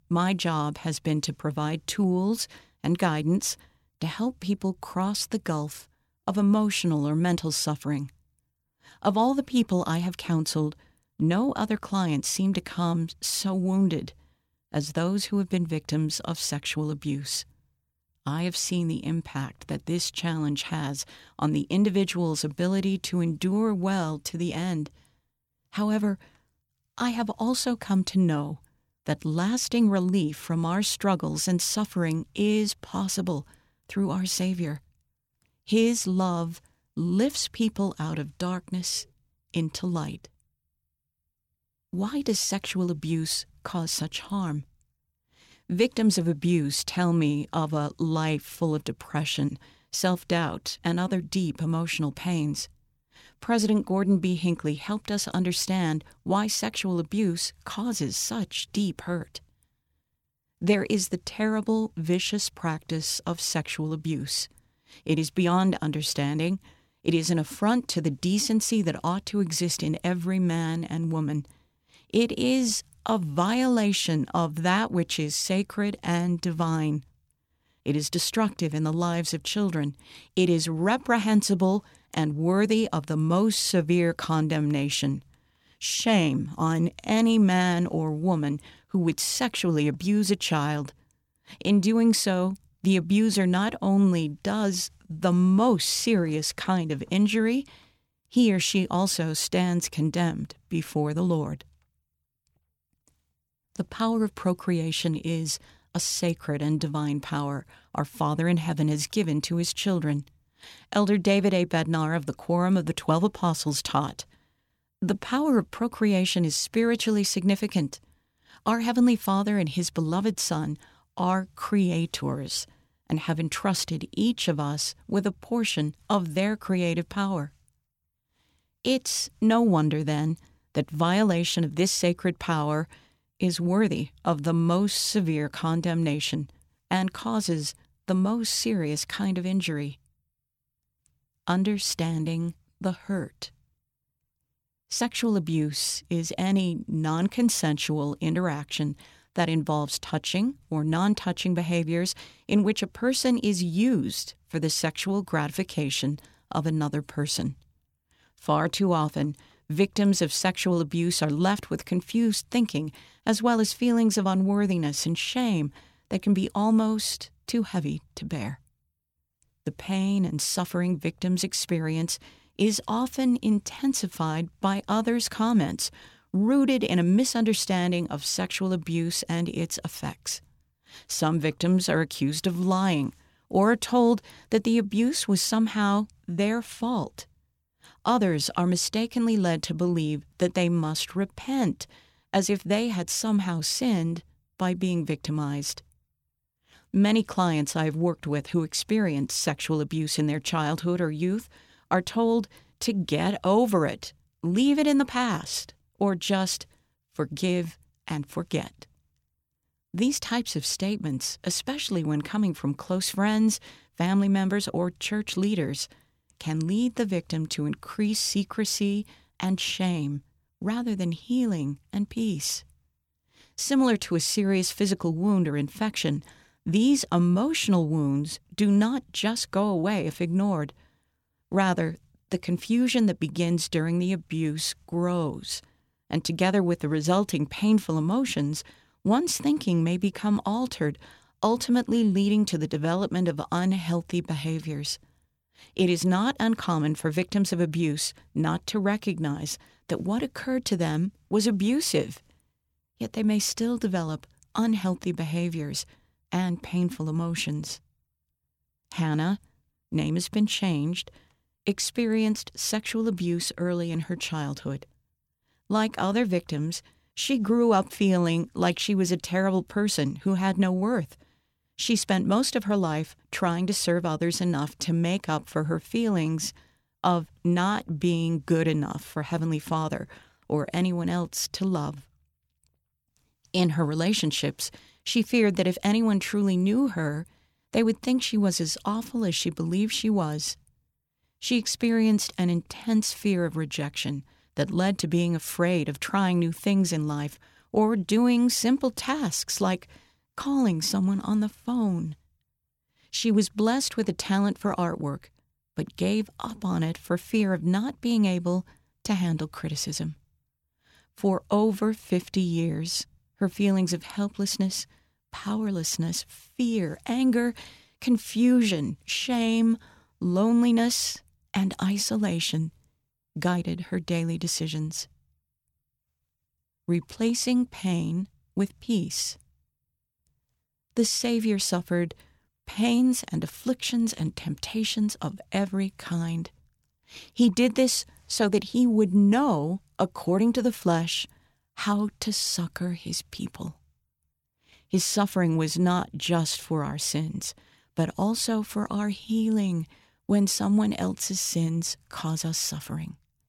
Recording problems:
none

